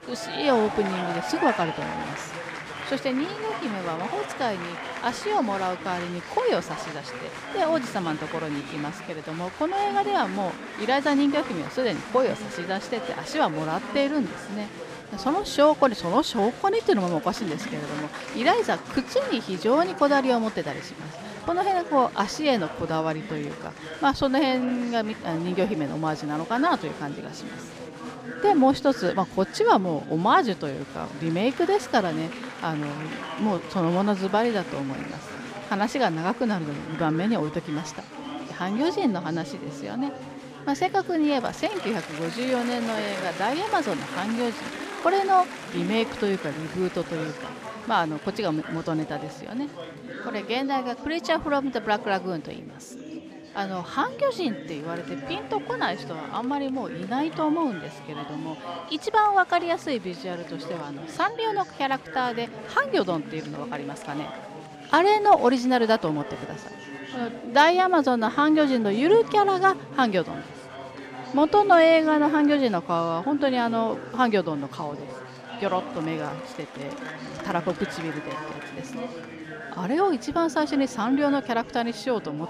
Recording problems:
chatter from many people; noticeable; throughout; 10 dB below the speech

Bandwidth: 14.5 kHz